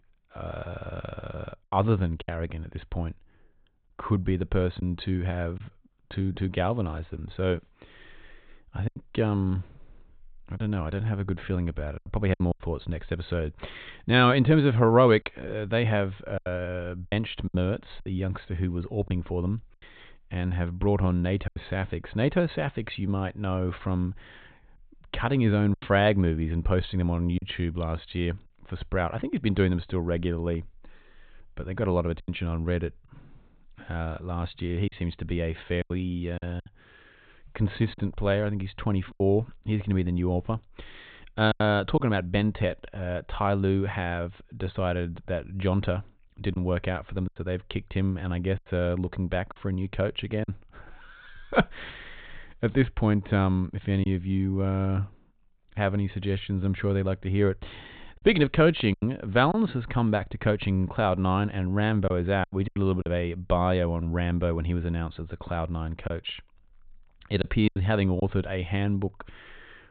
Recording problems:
high frequencies cut off; severe; nothing above 4 kHz
choppy; occasionally; 4% of the speech affected

